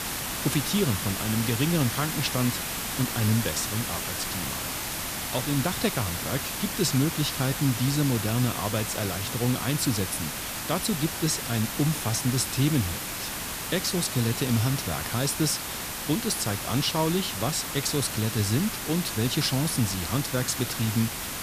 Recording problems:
hiss; loud; throughout; 3 dB below the speech

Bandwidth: 14.5 kHz